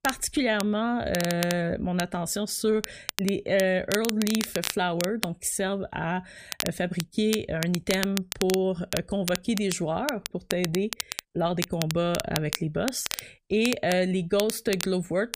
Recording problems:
crackle, like an old record; loud; 7 dB below the speech

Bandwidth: 15 kHz